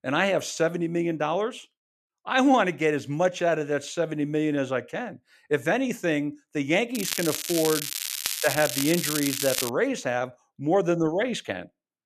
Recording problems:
crackling; loud; from 7 to 9.5 s; 2 dB below the speech

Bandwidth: 14.5 kHz